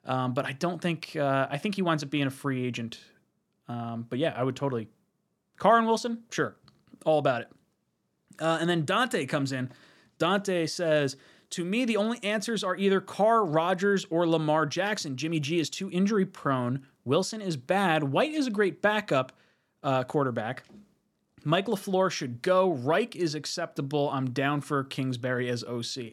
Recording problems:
none

